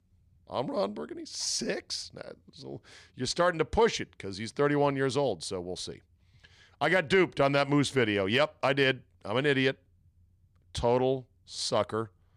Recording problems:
none

